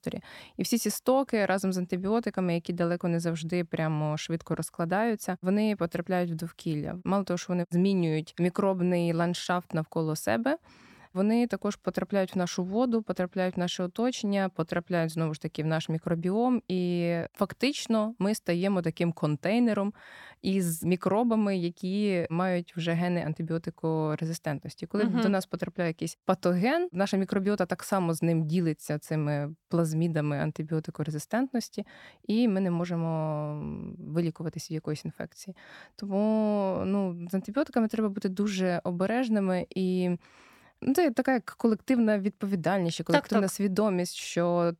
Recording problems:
none

